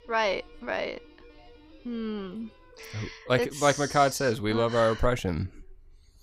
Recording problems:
background music; faint; until 3 s; 25 dB below the speech

